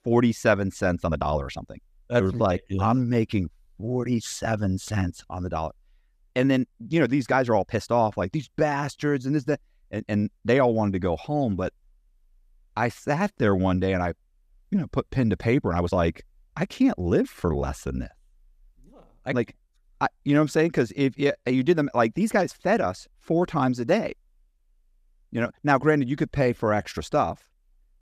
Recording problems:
uneven, jittery; strongly; from 1 to 27 s

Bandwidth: 14.5 kHz